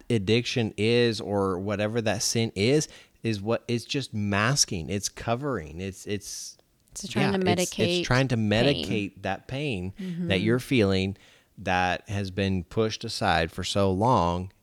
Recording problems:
none

